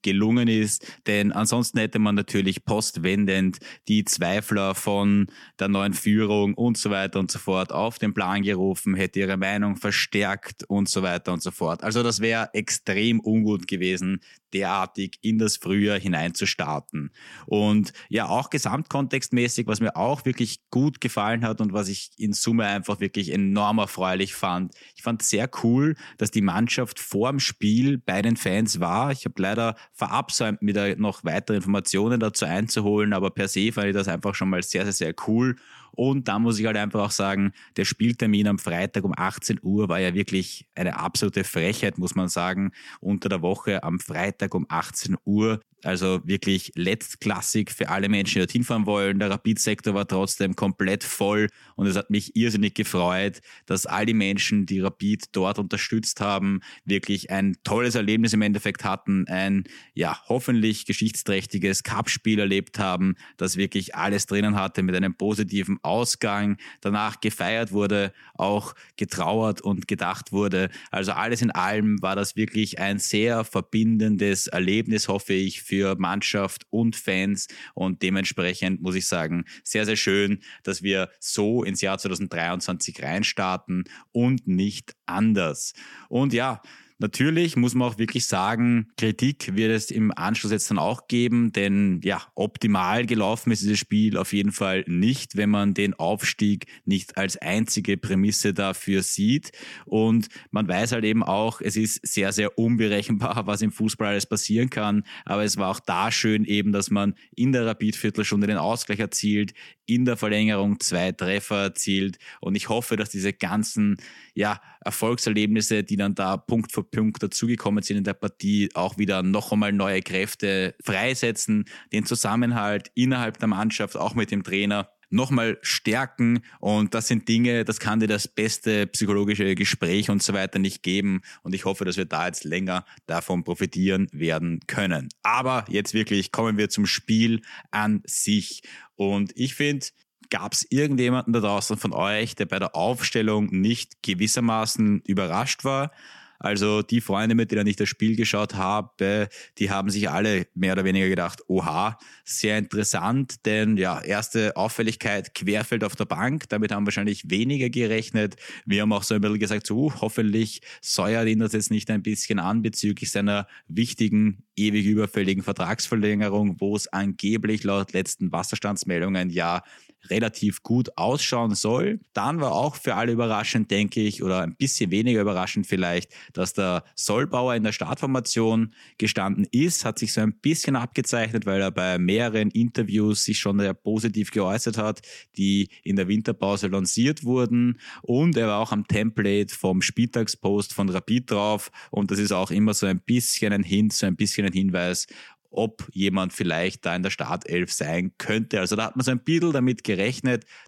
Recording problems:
none

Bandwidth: 17 kHz